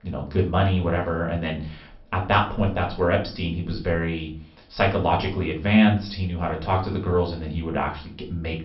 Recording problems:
off-mic speech; far
high frequencies cut off; noticeable; nothing above 5.5 kHz
room echo; slight; dies away in 0.3 s

